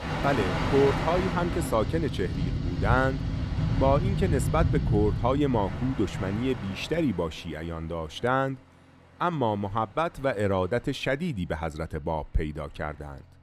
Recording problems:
train or aircraft noise; loud; throughout; 2 dB below the speech

